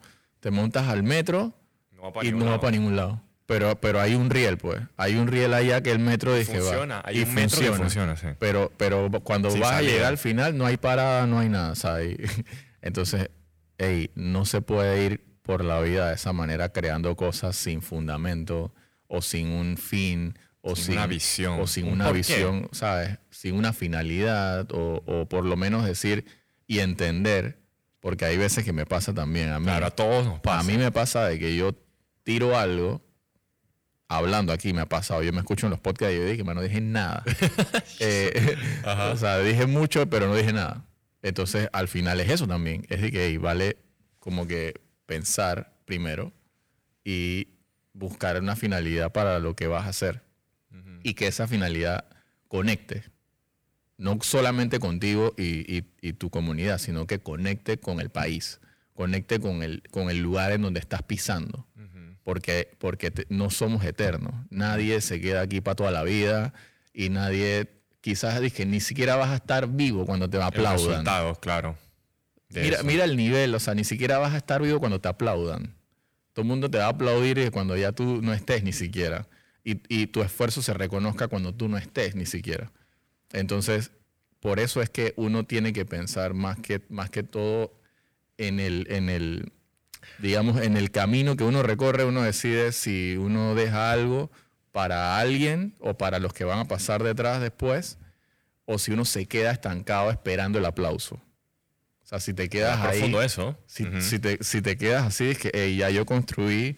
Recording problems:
distortion; slight; 10 dB below the speech

